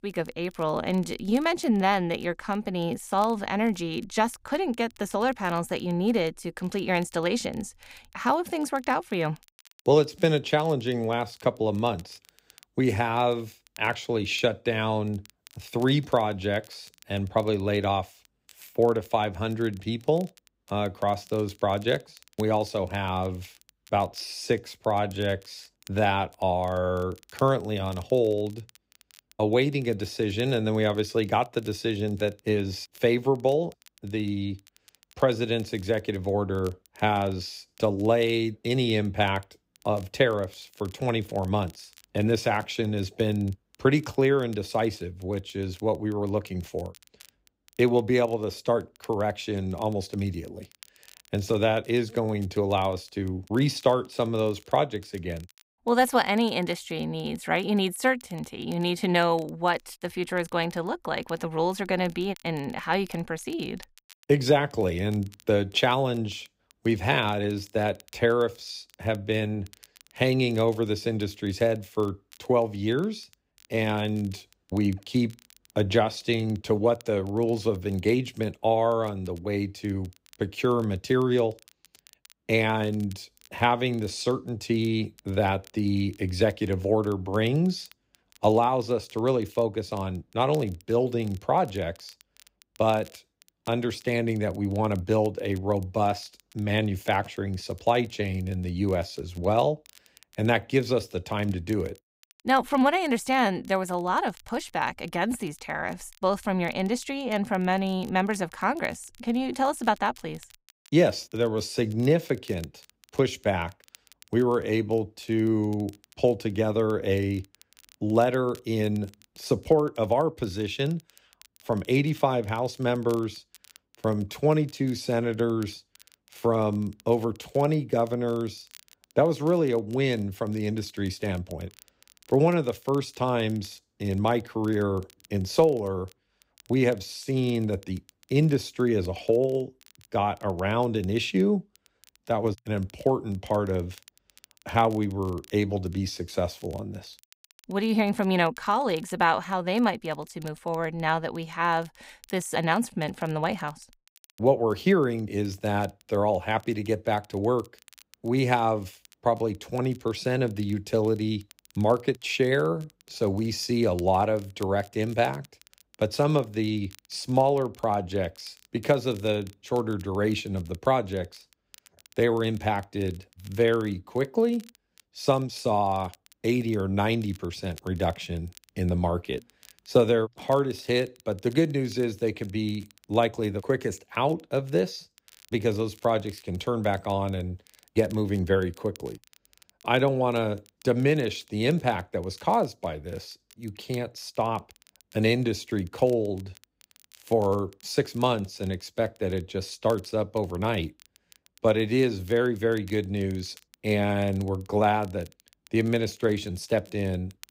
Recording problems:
crackle, like an old record; faint; 30 dB below the speech

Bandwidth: 15.5 kHz